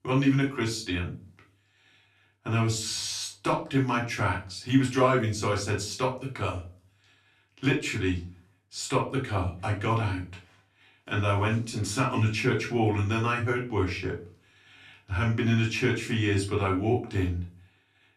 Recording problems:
off-mic speech; far
room echo; slight; dies away in 0.3 s

